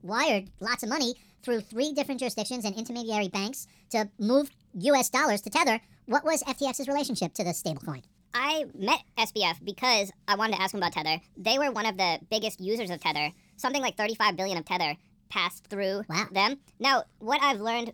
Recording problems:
wrong speed and pitch; too fast and too high; 1.5 times normal speed

